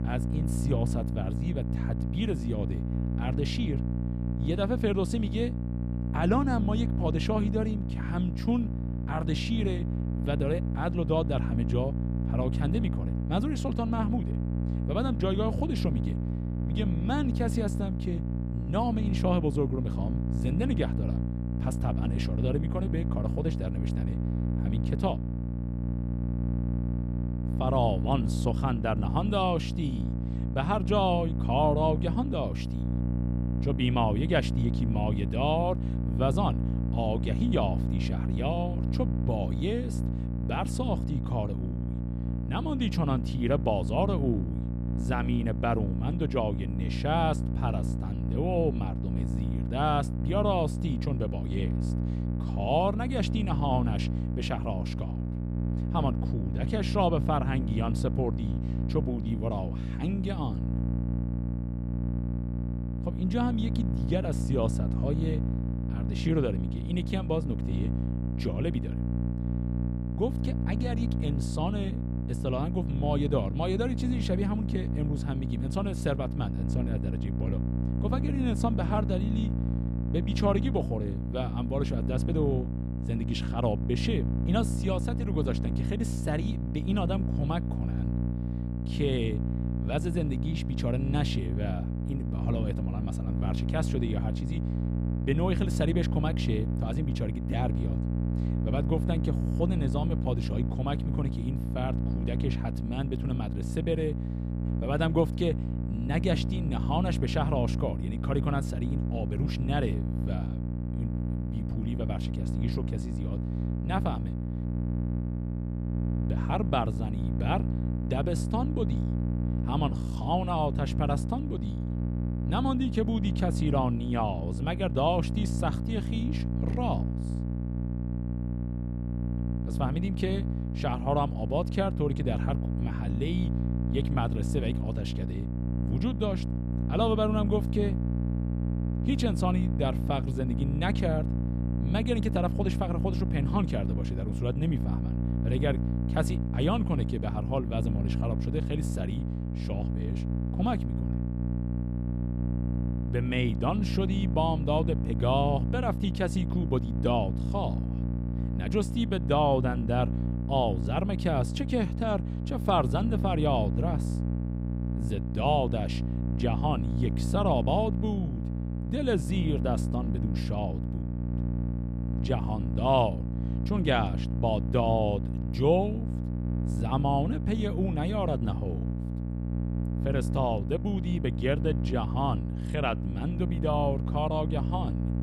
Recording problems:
electrical hum; loud; throughout; 60 Hz, 8 dB below the speech

